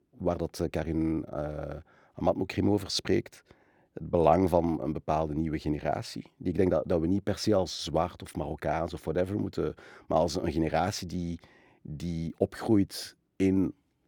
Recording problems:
none

